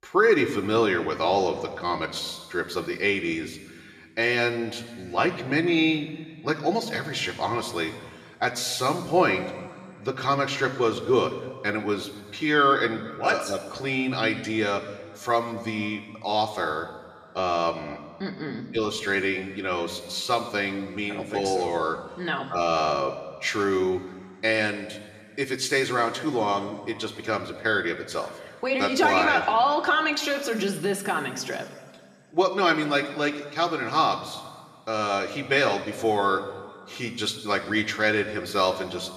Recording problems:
room echo; noticeable; dies away in 1.6 s
off-mic speech; somewhat distant

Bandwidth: 14.5 kHz